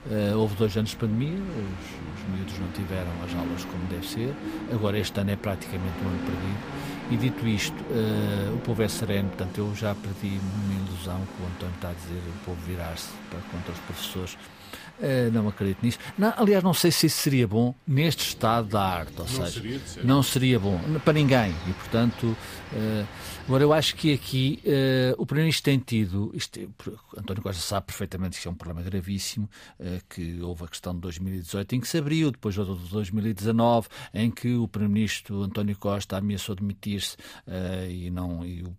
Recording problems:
train or aircraft noise; noticeable; until 25 s; 10 dB below the speech

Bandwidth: 15 kHz